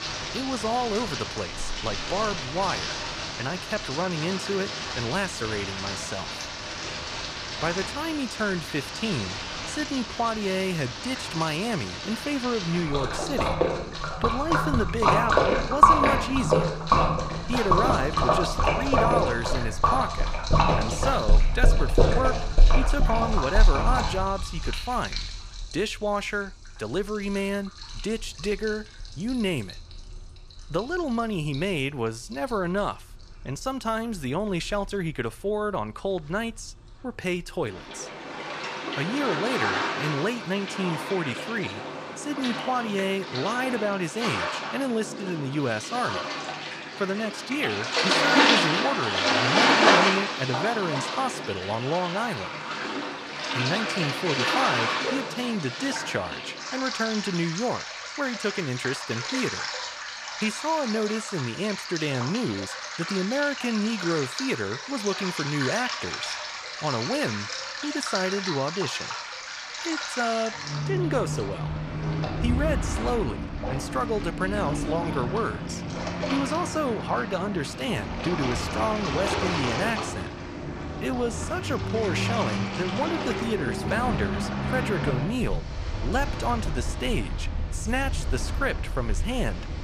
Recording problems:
rain or running water; very loud; throughout; 2 dB above the speech

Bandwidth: 14.5 kHz